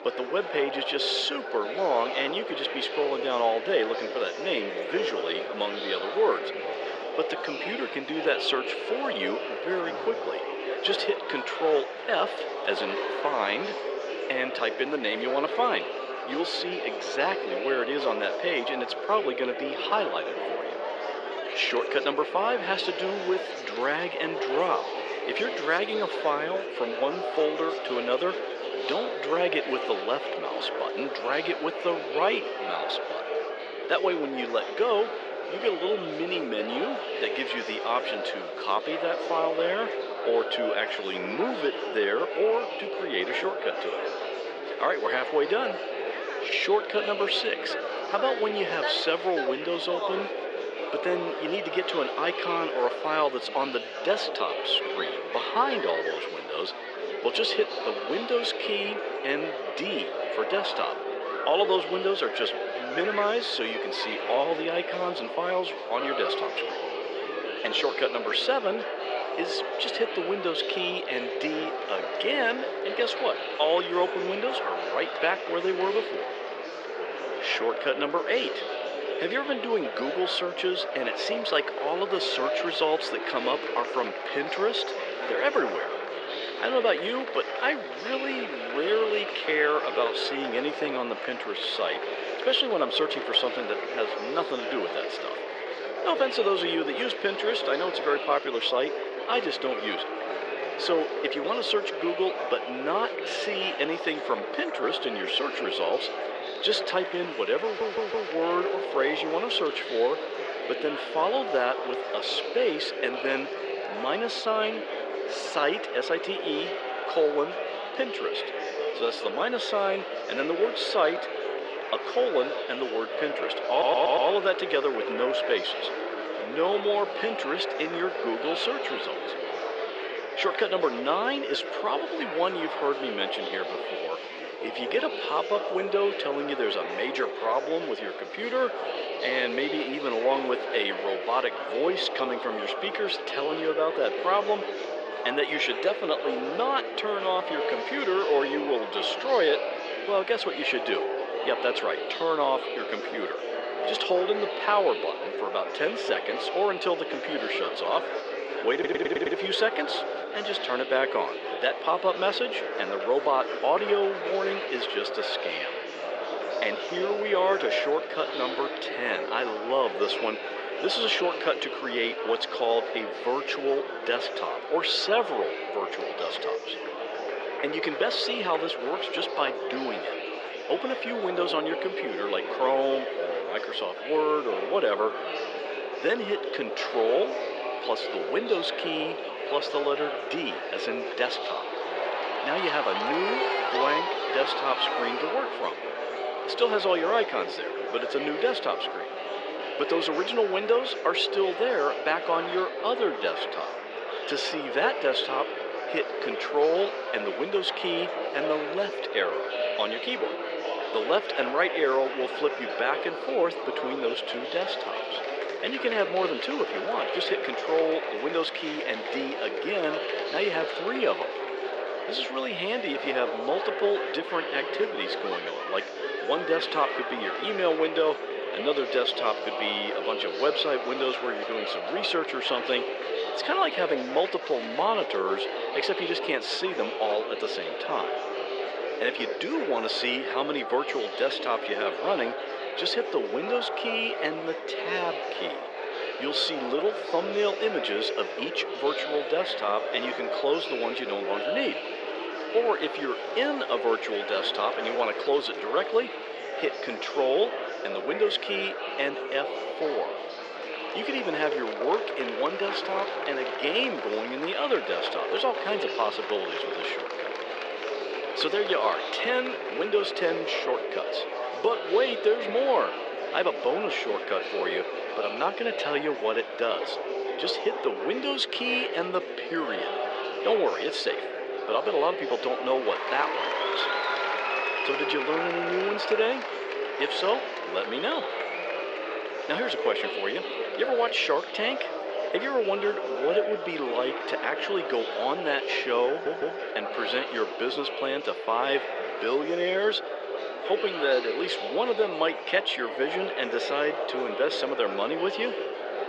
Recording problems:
thin; very; fading below 450 Hz
muffled; very slightly; fading above 3.5 kHz
murmuring crowd; loud; throughout; 4 dB below the speech
rain or running water; faint; throughout; 25 dB below the speech
audio stuttering; 4 times, first at 1:48

